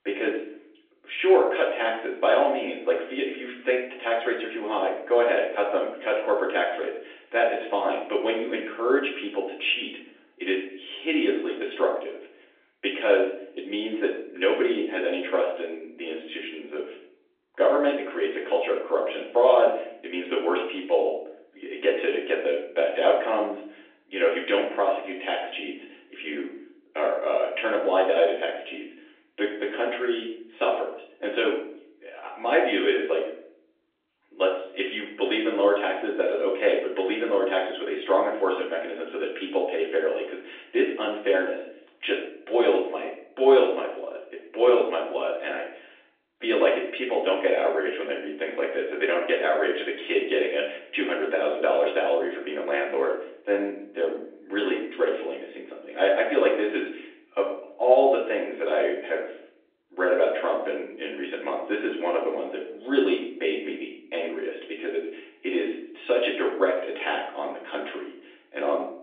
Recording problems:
off-mic speech; far
room echo; noticeable; dies away in 0.5 s
thin; somewhat; fading below 300 Hz
phone-call audio; nothing above 3.5 kHz

